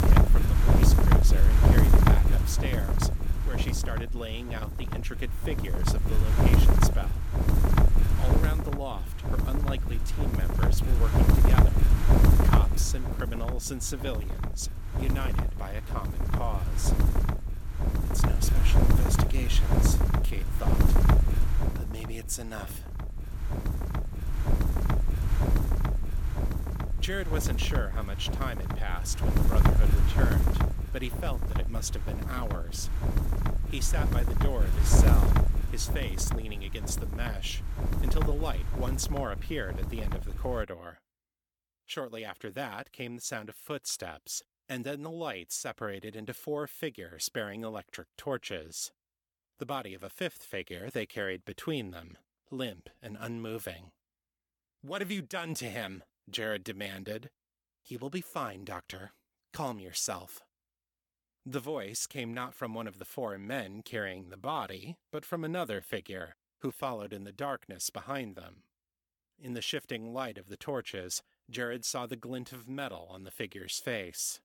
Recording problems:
wind noise on the microphone; heavy; until 41 s; 1 dB above the speech

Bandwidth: 18 kHz